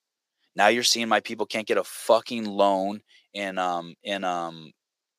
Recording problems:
thin; somewhat; fading below 450 Hz

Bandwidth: 15 kHz